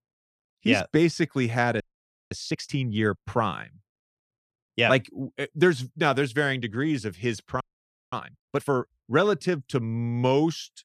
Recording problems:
audio freezing; at 2 s for 0.5 s and at 7.5 s for 0.5 s

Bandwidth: 14.5 kHz